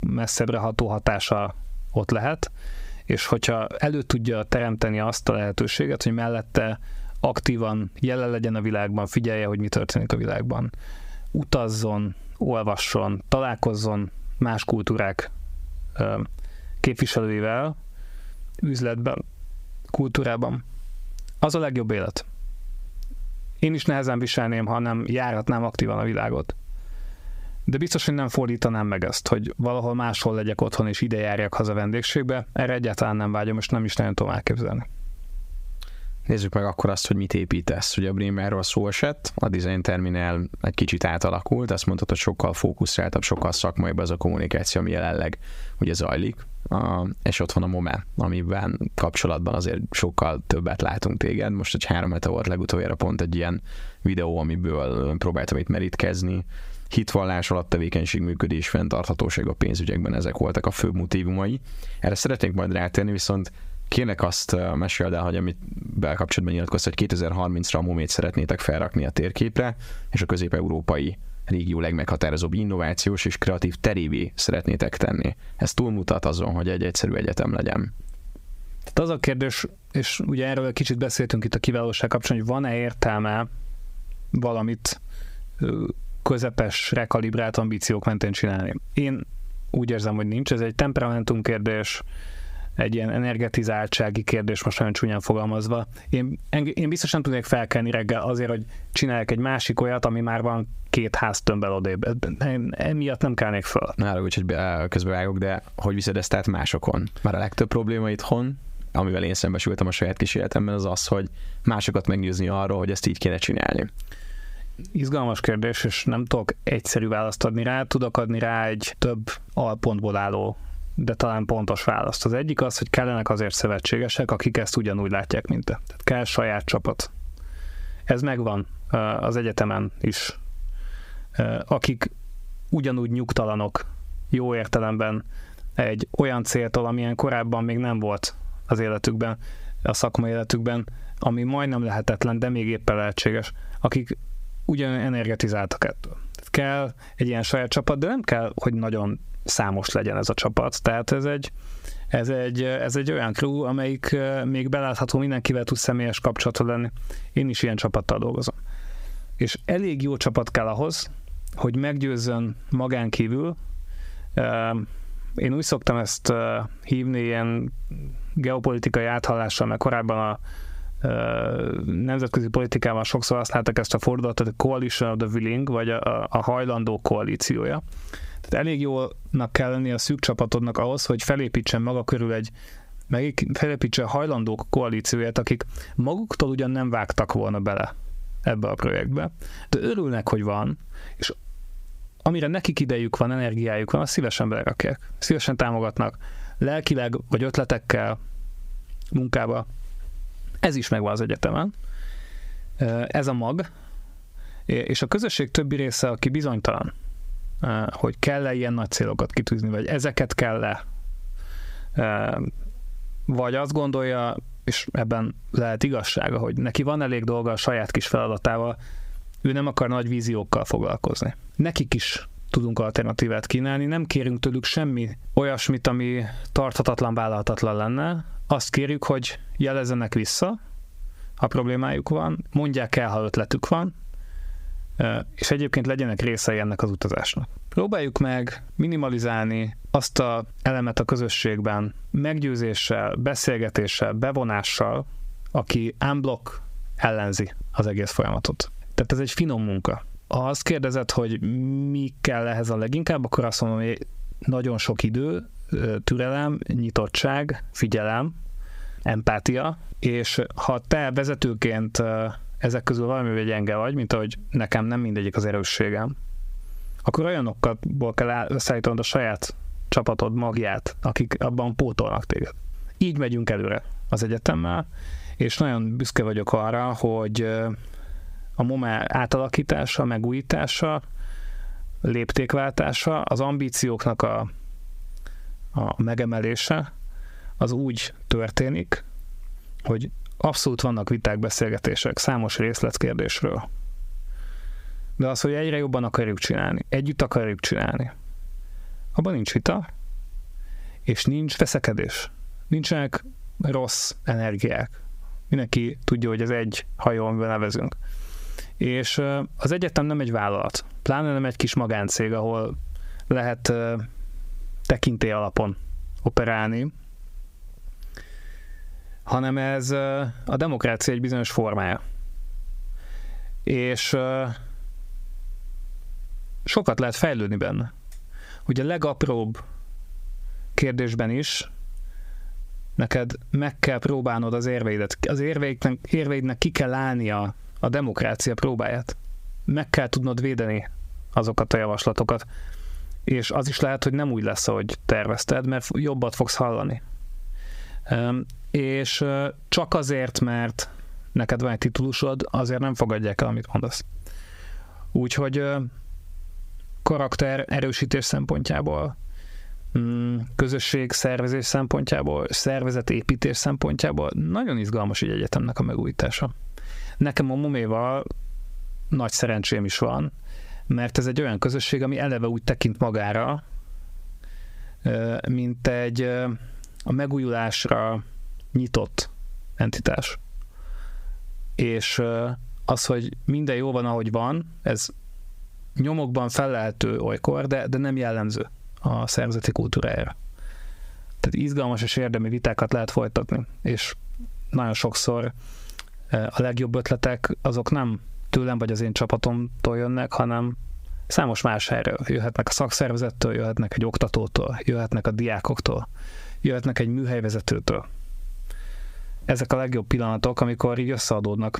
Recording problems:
squashed, flat; heavily

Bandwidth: 15.5 kHz